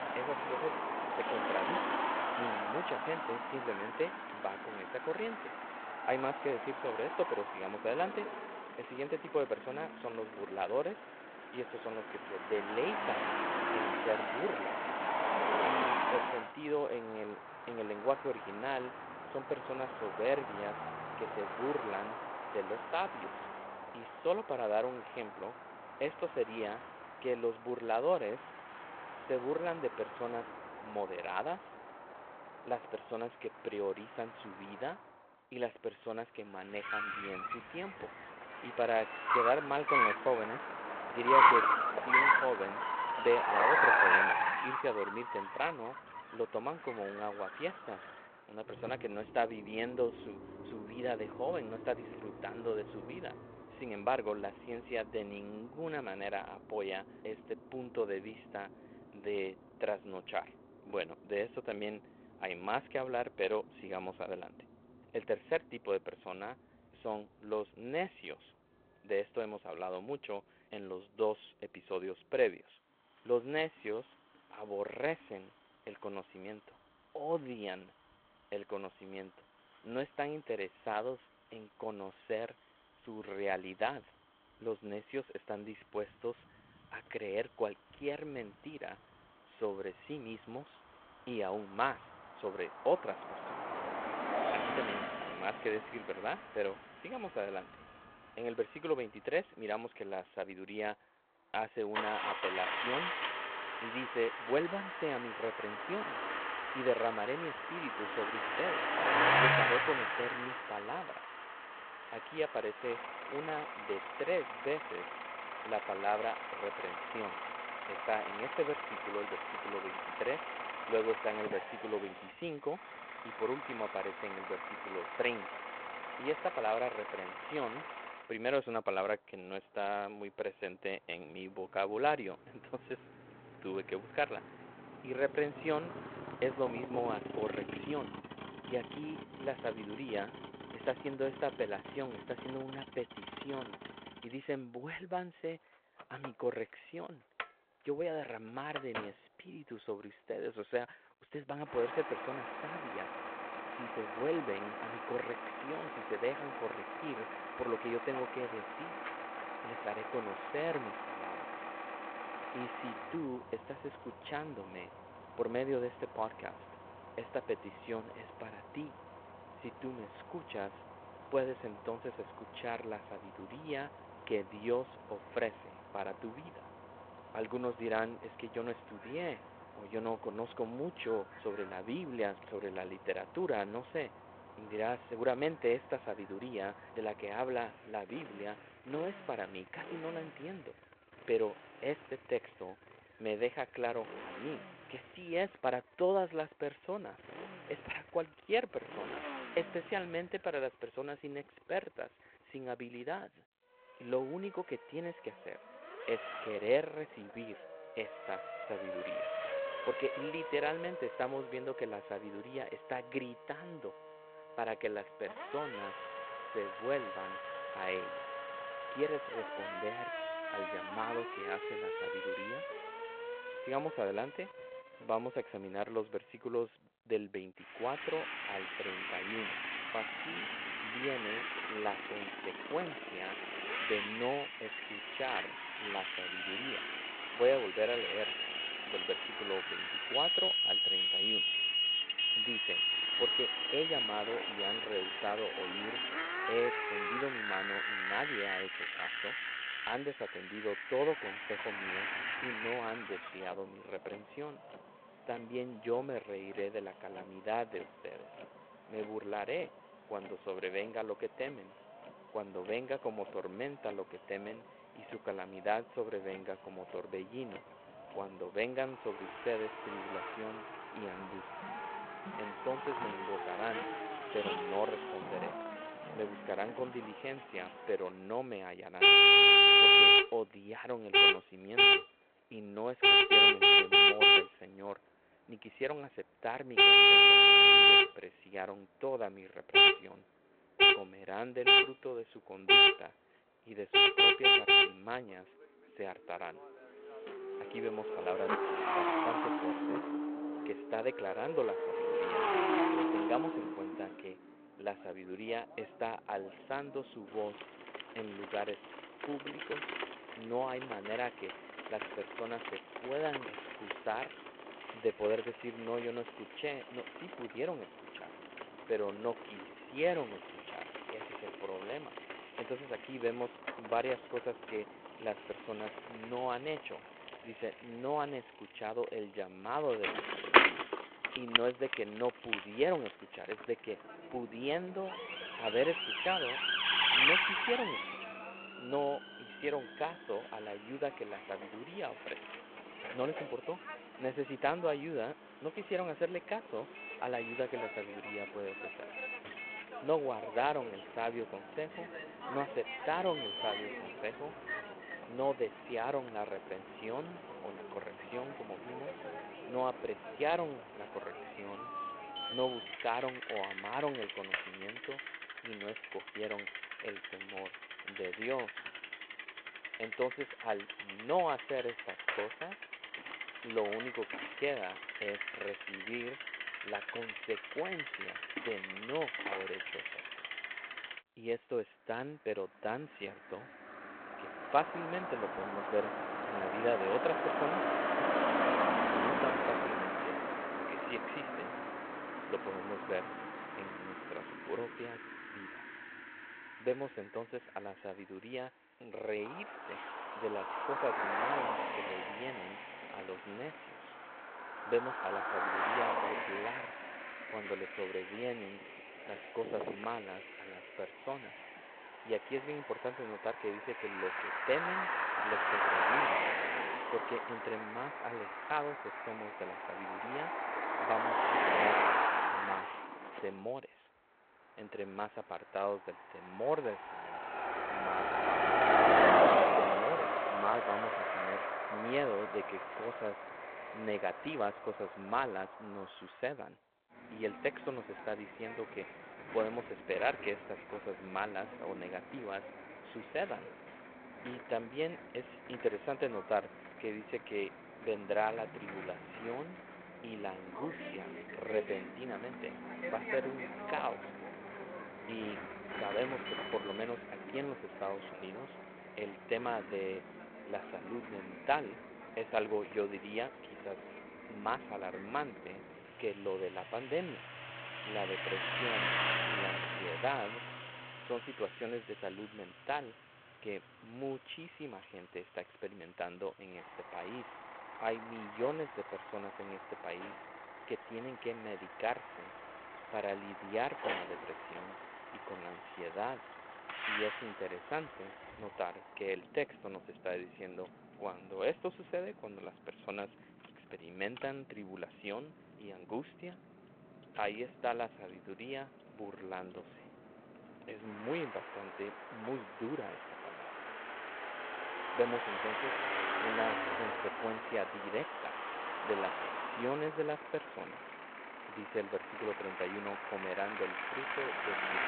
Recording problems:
phone-call audio
traffic noise; very loud; throughout; 8 dB above the speech

